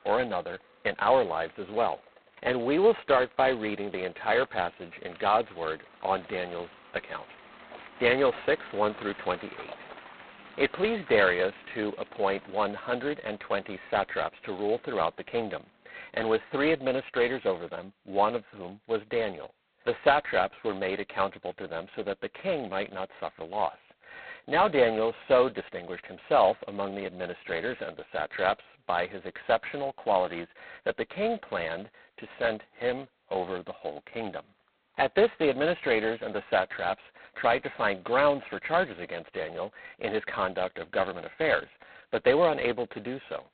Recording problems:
phone-call audio; poor line; nothing above 4 kHz
traffic noise; faint; throughout; 20 dB below the speech

